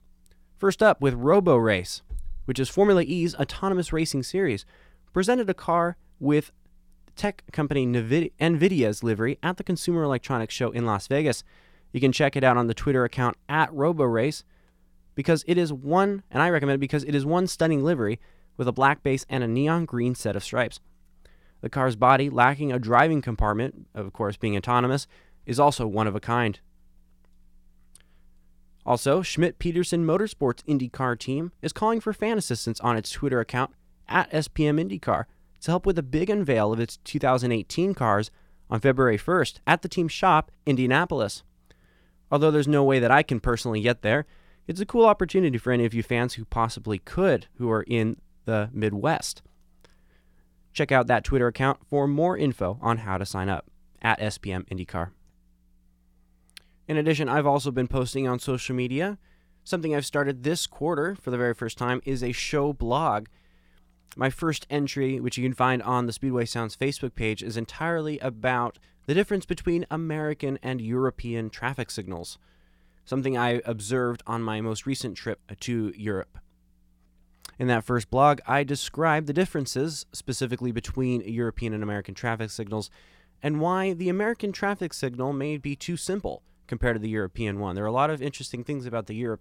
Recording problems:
none

